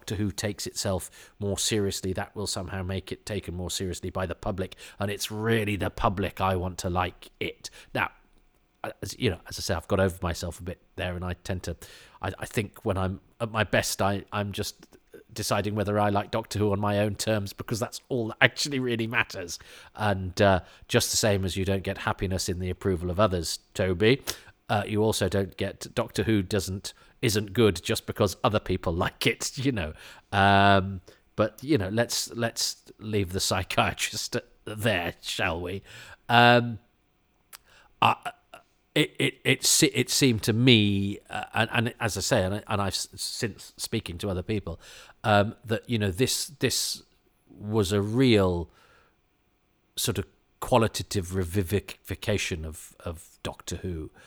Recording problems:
none

